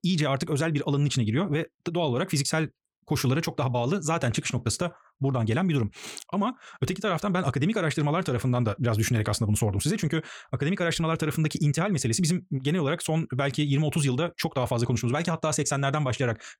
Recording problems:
wrong speed, natural pitch; too fast; 1.5 times normal speed

